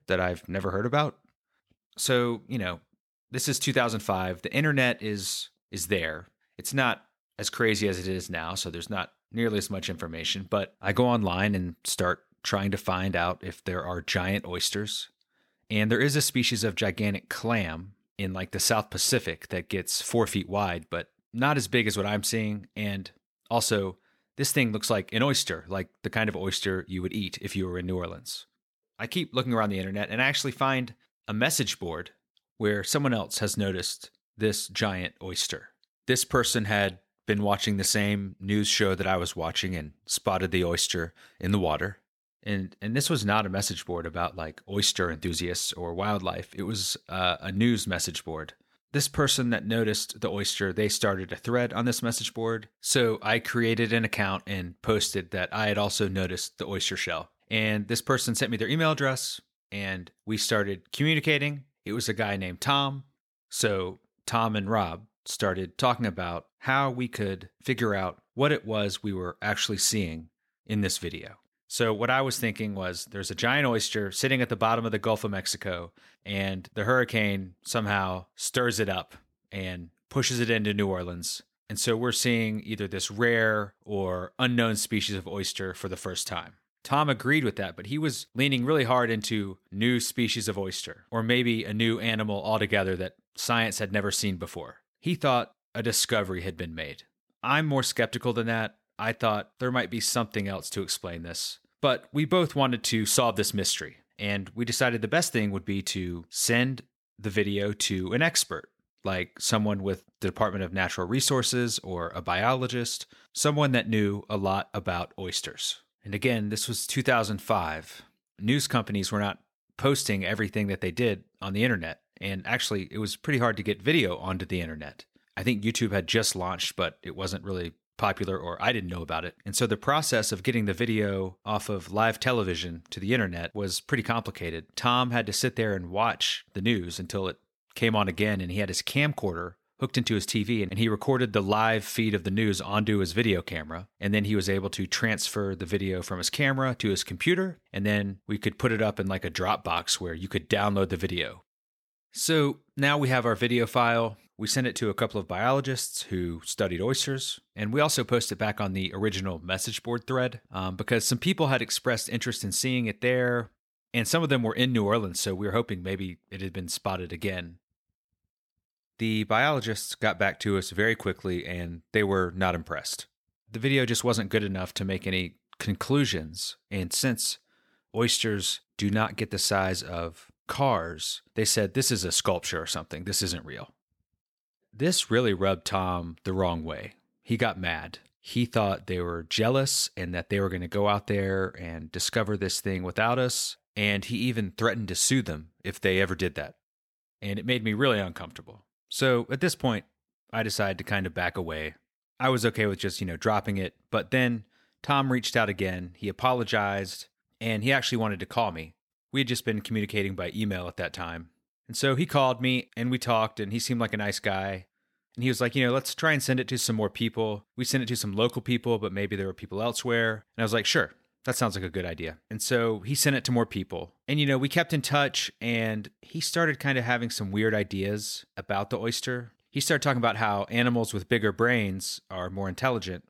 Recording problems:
none

